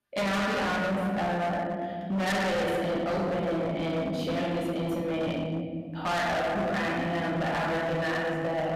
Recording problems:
distortion; heavy; 32% of the sound clipped
off-mic speech; far
room echo; noticeable; dies away in 2.2 s

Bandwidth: 14.5 kHz